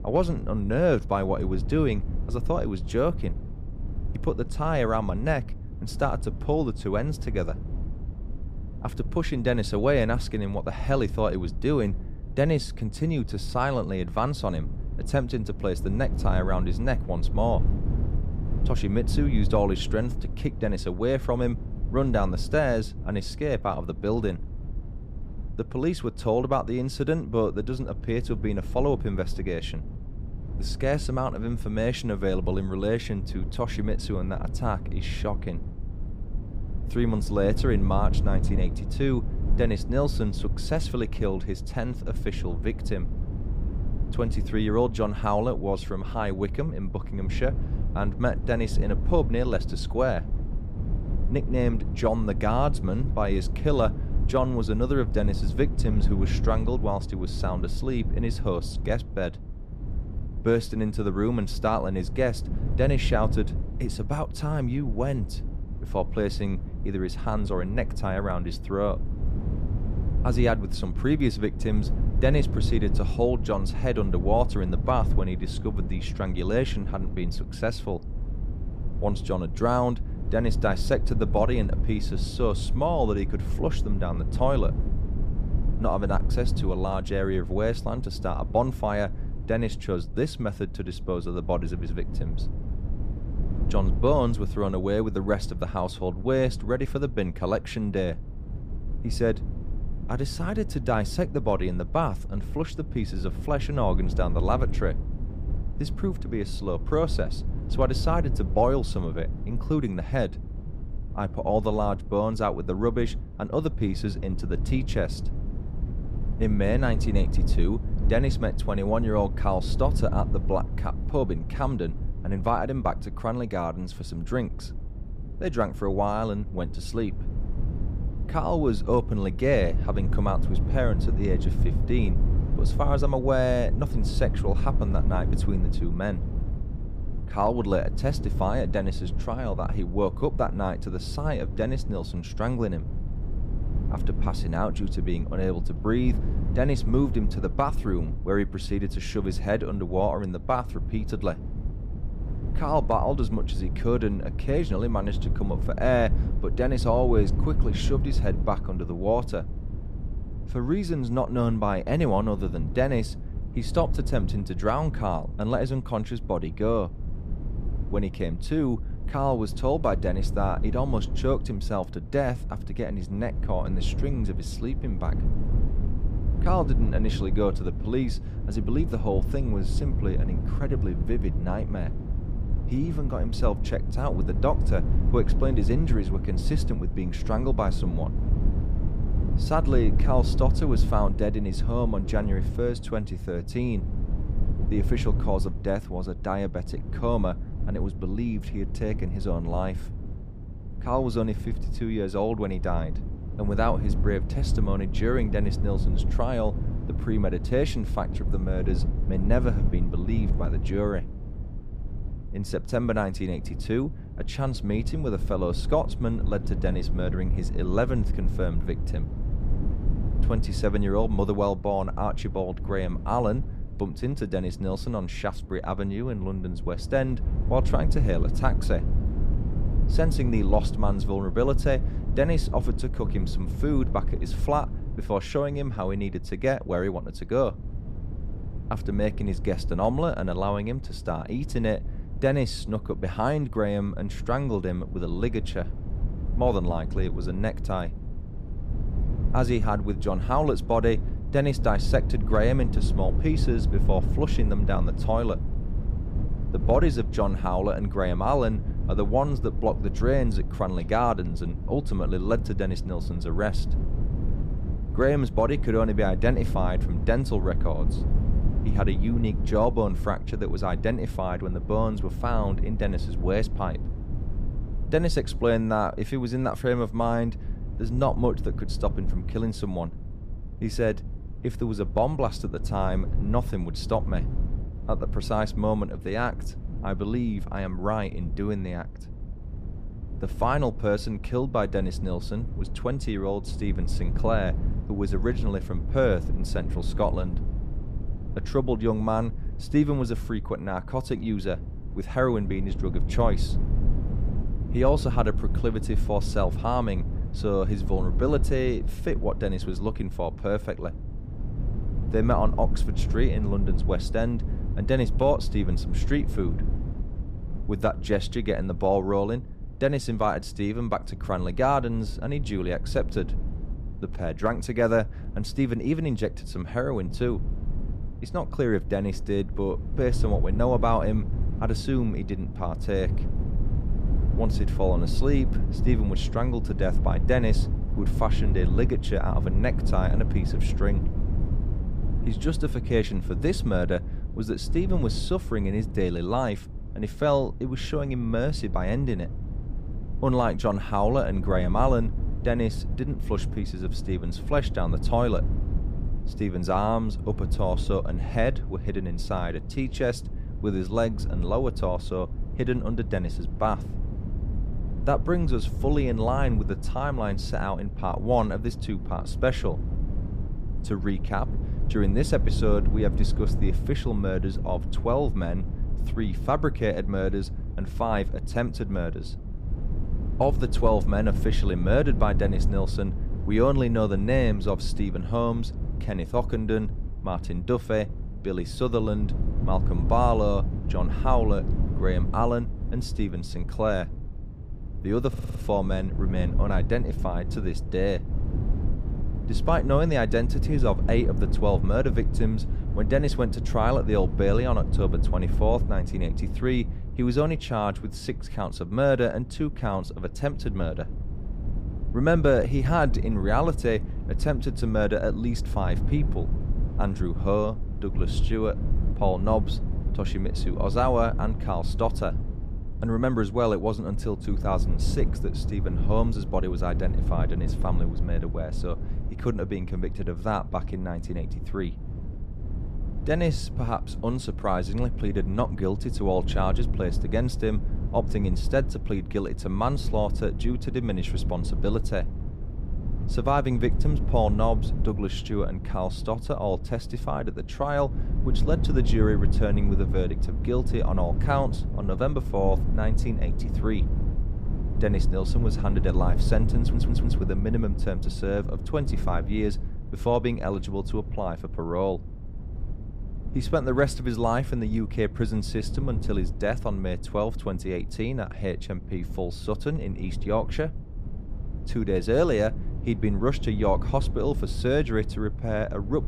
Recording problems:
low rumble; noticeable; throughout; 15 dB below the speech
audio stuttering; at 6:35 and at 7:37

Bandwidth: 15 kHz